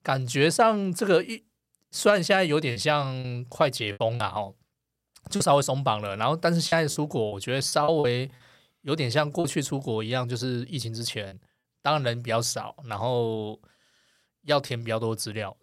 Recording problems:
choppy; very; from 2.5 to 4 s, from 5.5 to 9.5 s and at 11 s; 8% of the speech affected

